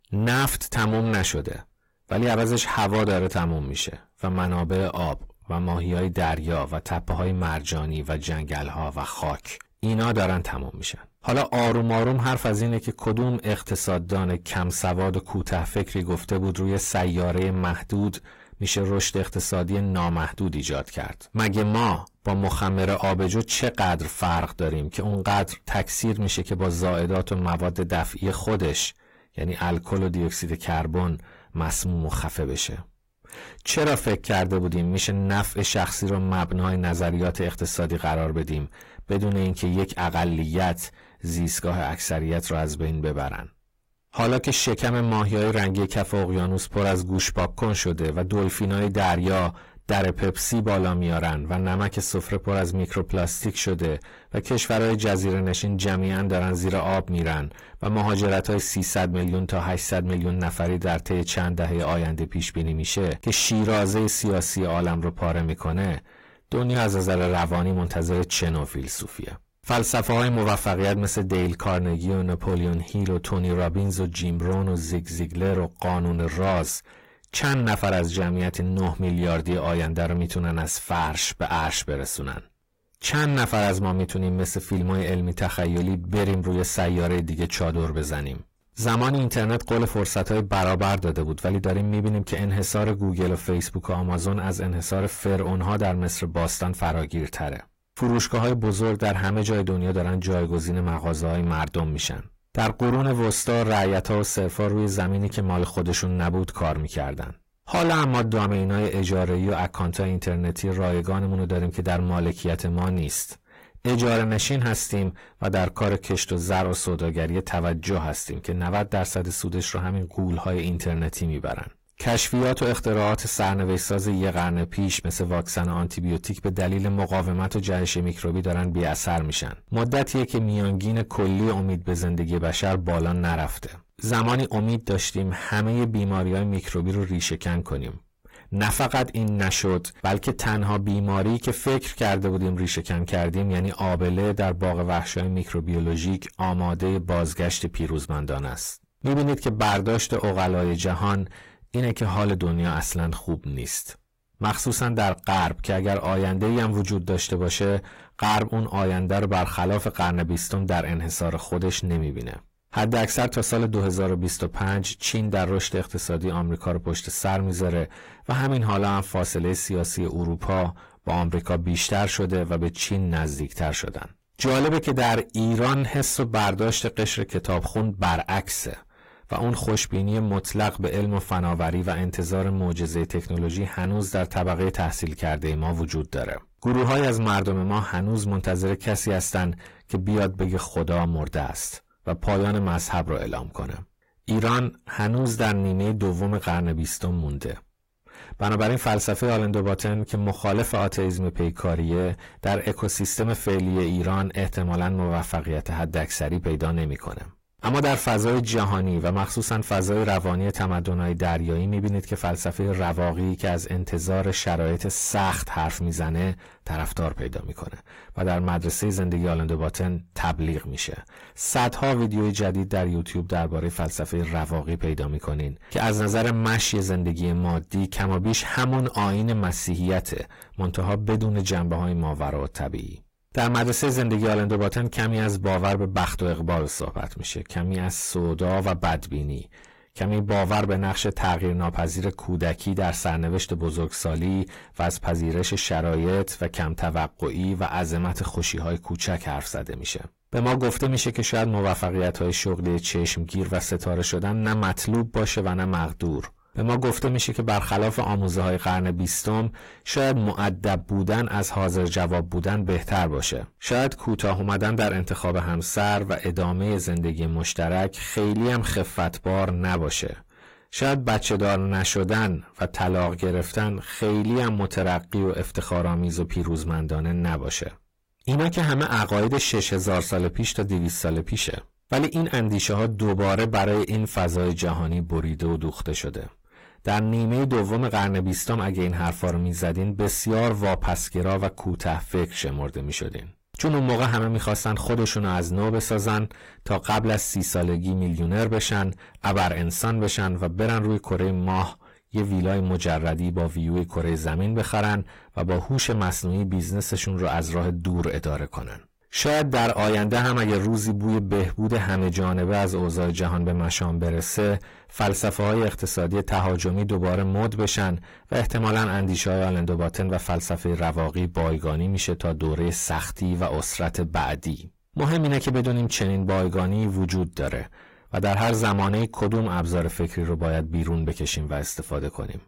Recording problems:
distortion; heavy; 6 dB below the speech
garbled, watery; slightly; nothing above 15.5 kHz

